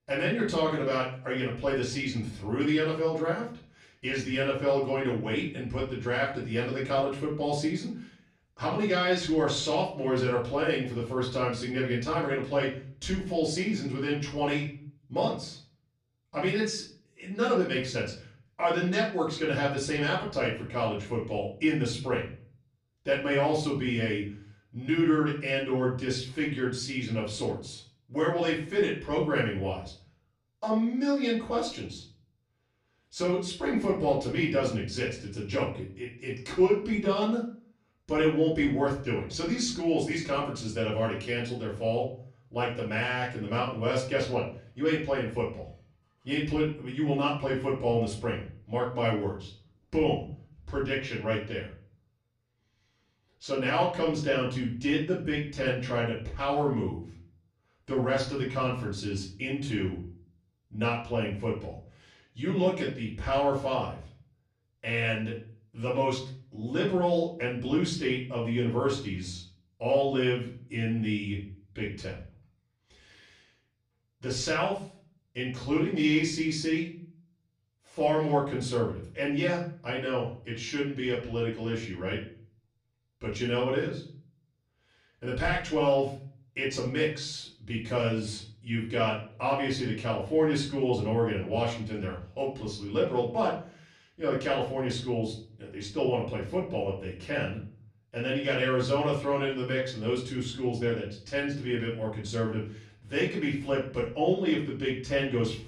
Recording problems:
off-mic speech; far
room echo; slight; dies away in 0.4 s

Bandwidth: 15 kHz